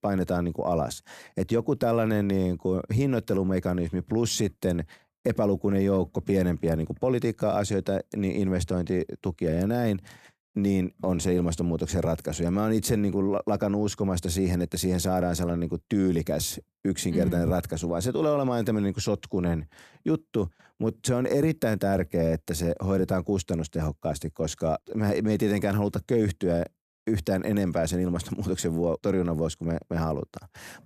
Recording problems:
none

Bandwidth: 14.5 kHz